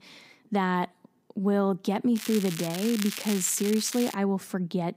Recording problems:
crackling; loud; from 2 to 4 s; 9 dB below the speech

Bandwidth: 15.5 kHz